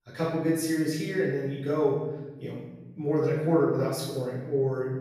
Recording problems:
room echo; strong; dies away in 1.3 s
off-mic speech; far

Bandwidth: 14.5 kHz